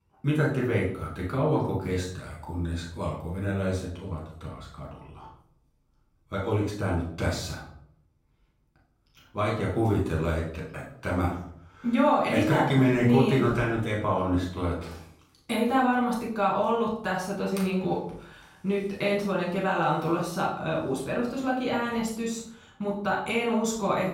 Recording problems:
off-mic speech; far
room echo; noticeable; dies away in 0.6 s

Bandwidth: 16.5 kHz